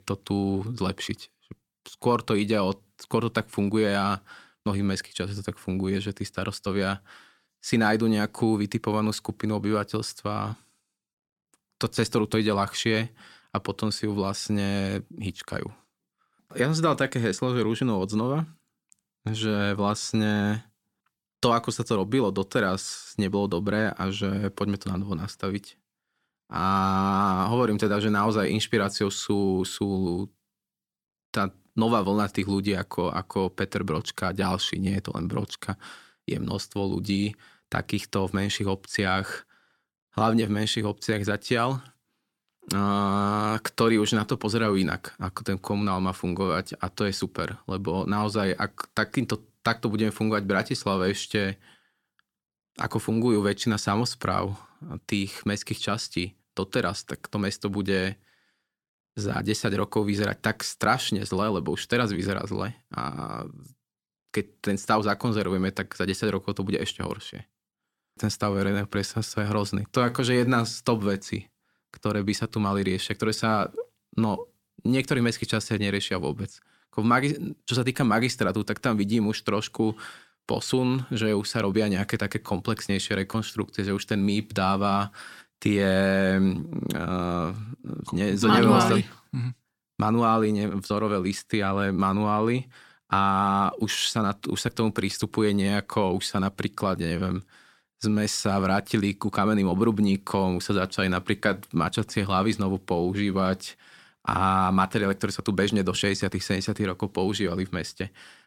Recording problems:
none

